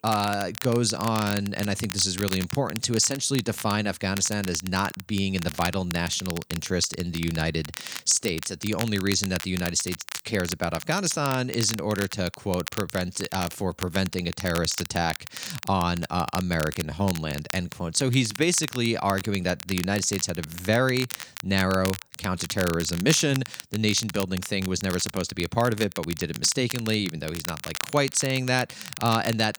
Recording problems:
crackle, like an old record; noticeable; 10 dB below the speech

